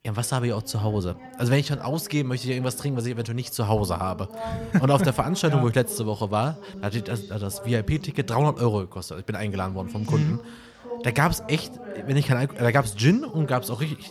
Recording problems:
background chatter; noticeable; throughout; 2 voices, 15 dB below the speech

